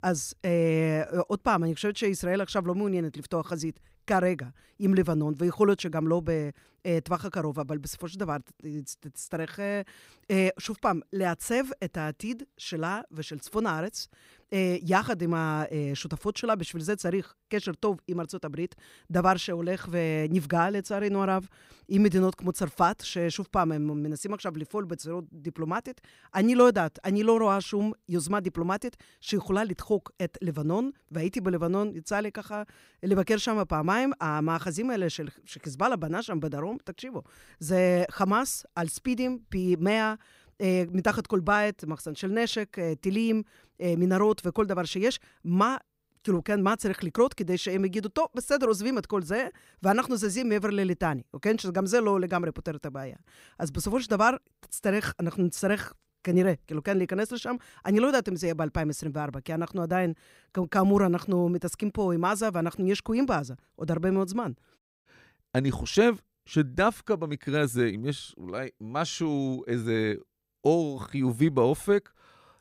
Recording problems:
none

